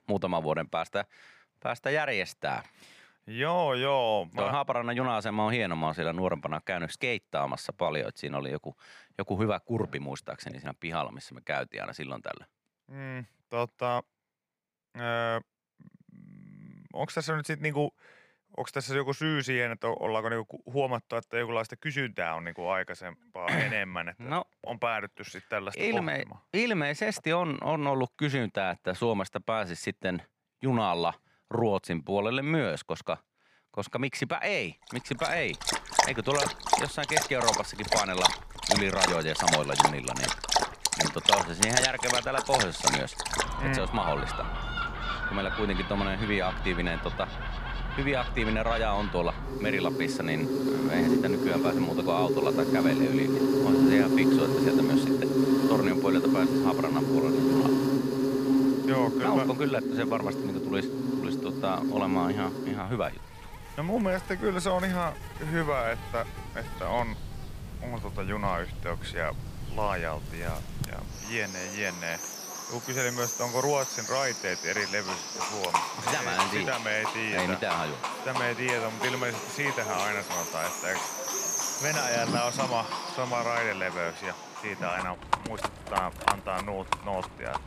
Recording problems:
animal sounds; very loud; from 35 s on; 2 dB above the speech

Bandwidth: 15 kHz